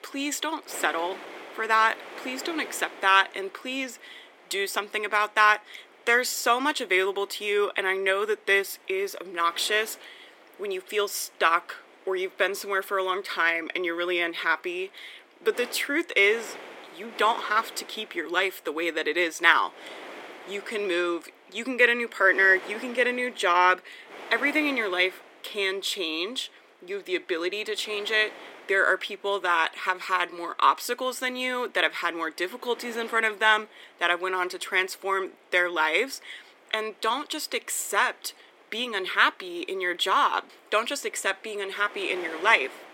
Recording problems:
thin; somewhat; fading below 300 Hz
wind noise on the microphone; occasional gusts; 20 dB below the speech

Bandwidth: 16.5 kHz